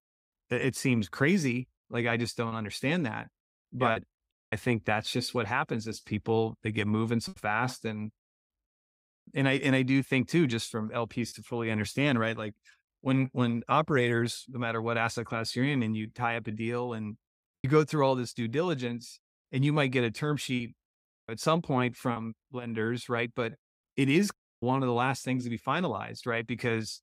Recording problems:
choppy; occasionally; 2% of the speech affected

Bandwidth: 15.5 kHz